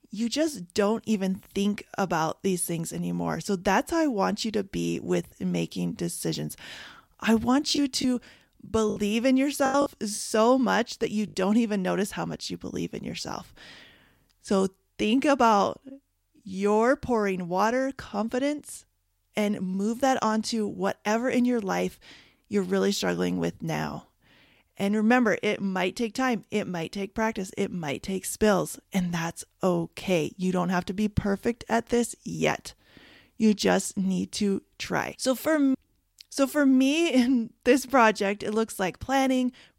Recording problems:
choppy; very; from 8 to 10 s; 8% of the speech affected

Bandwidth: 16 kHz